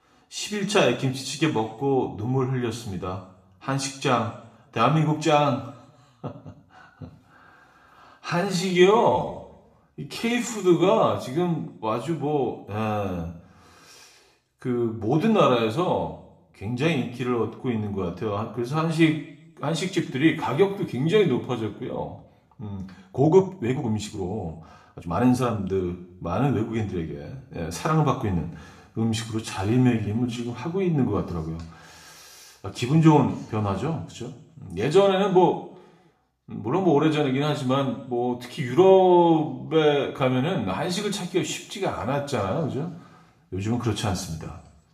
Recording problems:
room echo; slight; dies away in 0.6 s
off-mic speech; somewhat distant
uneven, jittery; strongly; from 8.5 to 31 s

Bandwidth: 14.5 kHz